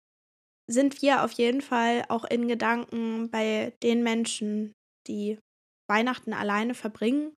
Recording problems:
none

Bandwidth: 14 kHz